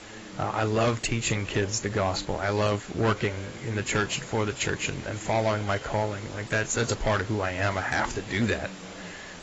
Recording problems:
garbled, watery; badly; nothing above 8 kHz
distortion; slight; 4% of the sound clipped
voice in the background; noticeable; throughout; 20 dB below the speech
hiss; noticeable; throughout; 15 dB below the speech

